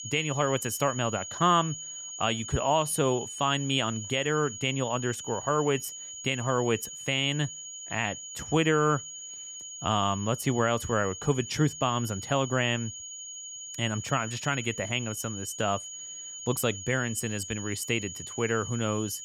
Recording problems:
high-pitched whine; loud; throughout; 6.5 kHz, 9 dB below the speech

